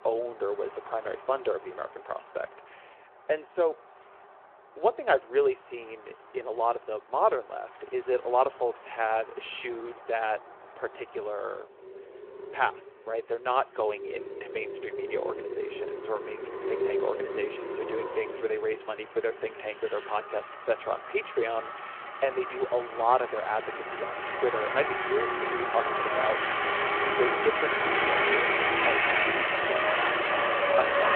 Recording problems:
phone-call audio
traffic noise; very loud; throughout; 3 dB above the speech

